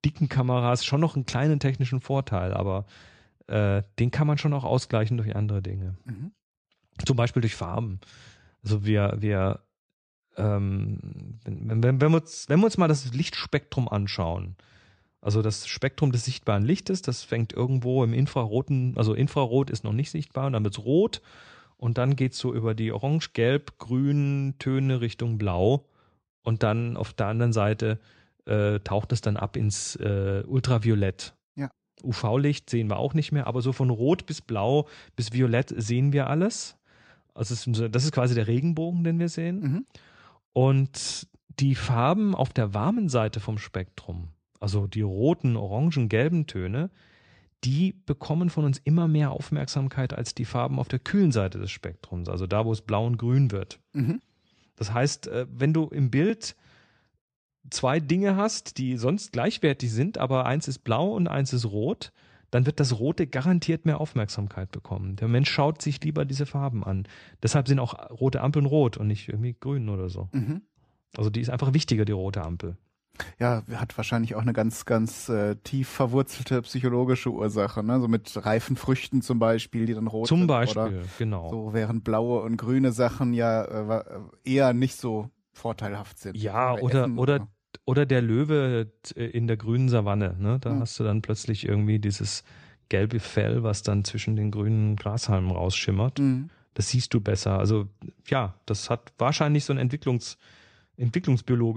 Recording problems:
abrupt cut into speech; at the end

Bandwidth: 14.5 kHz